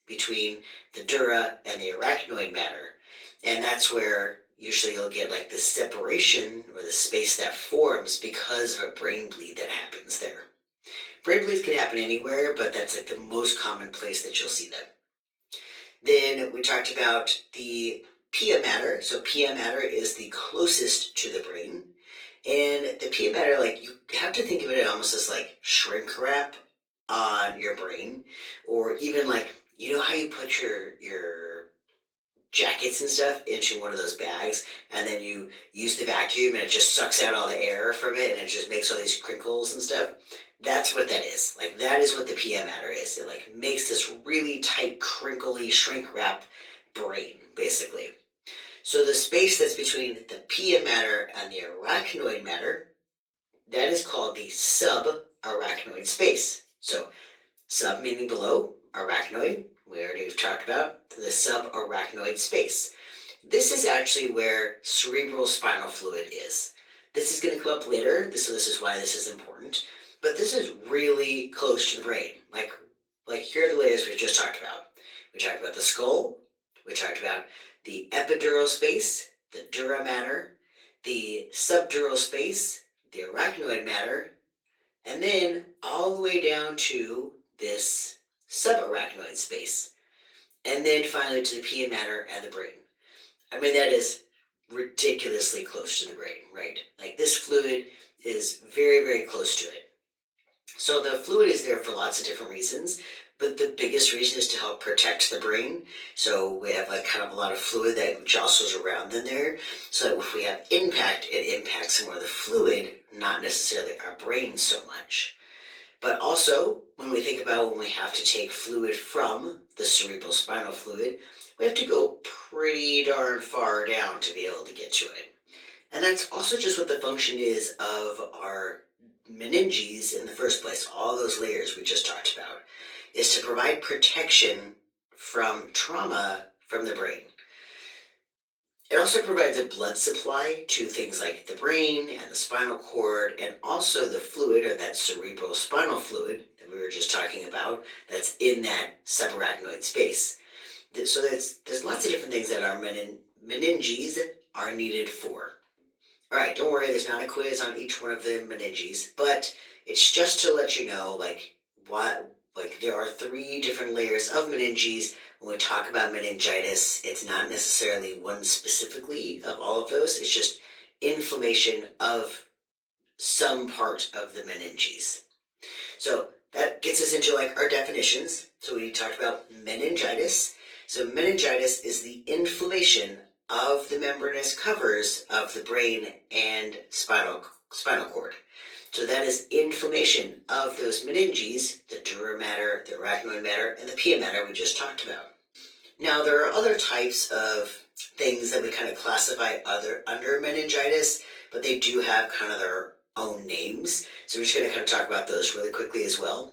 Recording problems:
off-mic speech; far
thin; very; fading below 400 Hz
room echo; slight; dies away in 0.3 s
garbled, watery; slightly; nothing above 18.5 kHz

